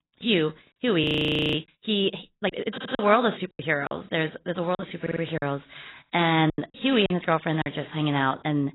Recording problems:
garbled, watery; badly; nothing above 4 kHz
audio freezing; at 1 s for 0.5 s
choppy; very; from 2.5 to 4 s and from 5 to 7.5 s; 8% of the speech affected
audio stuttering; at 2.5 s and at 5 s

